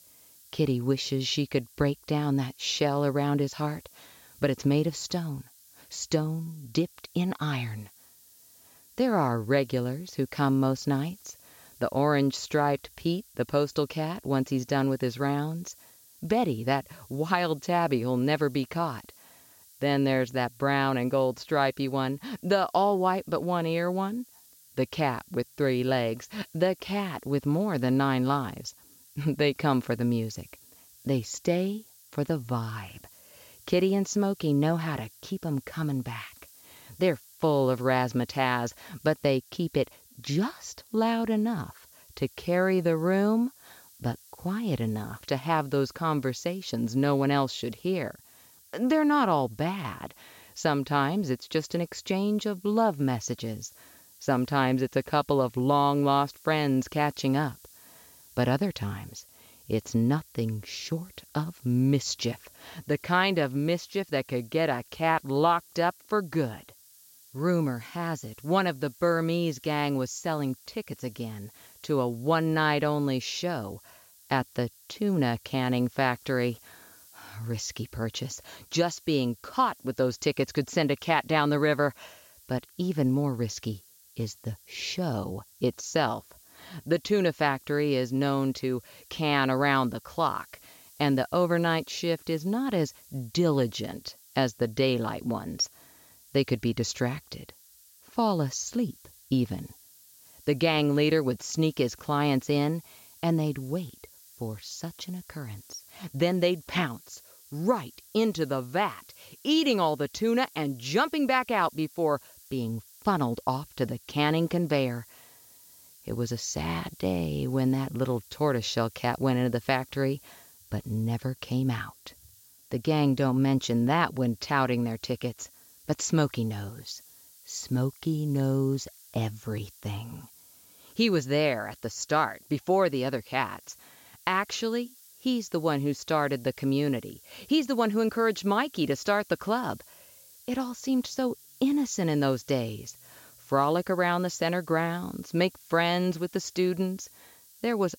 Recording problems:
high frequencies cut off; noticeable; nothing above 8 kHz
hiss; faint; throughout; 25 dB below the speech

